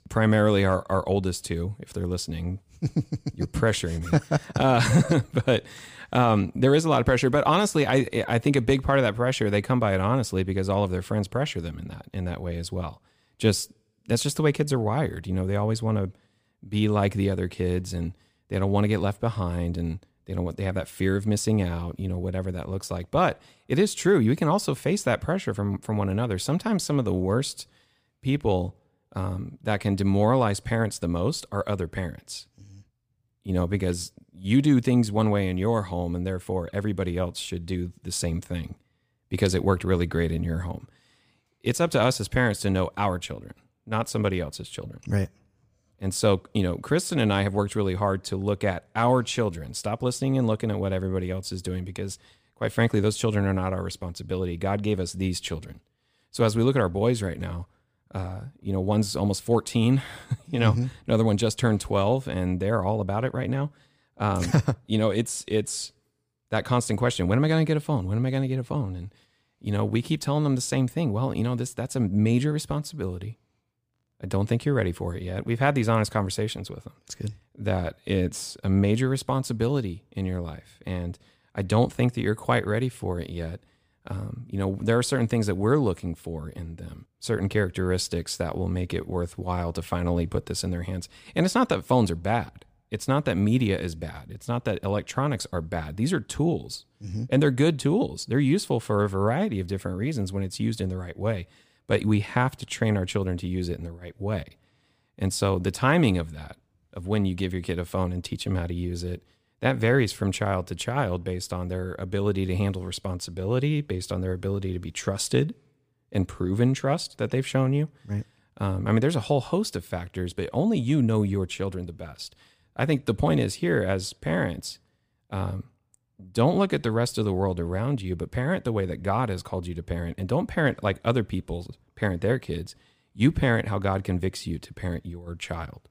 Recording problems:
none

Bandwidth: 15 kHz